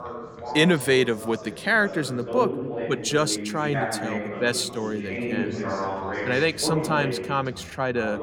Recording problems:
background chatter; loud; throughout; 3 voices, 6 dB below the speech

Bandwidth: 17 kHz